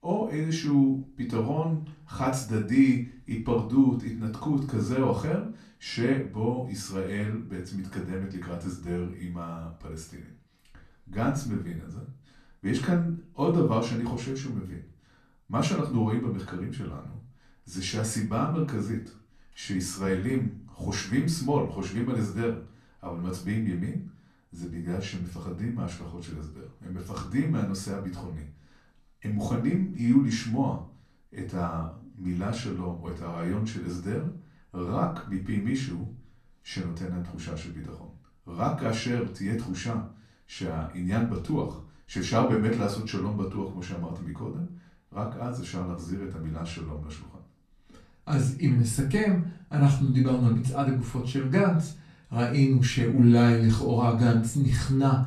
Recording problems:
off-mic speech; far
room echo; slight; dies away in 0.3 s

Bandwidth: 13.5 kHz